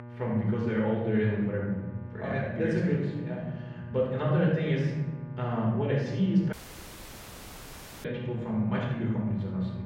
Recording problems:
off-mic speech; far
muffled; very; fading above 2.5 kHz
room echo; noticeable; dies away in 1.8 s
electrical hum; noticeable; throughout; 60 Hz, 15 dB below the speech
audio cutting out; at 6.5 s for 1.5 s

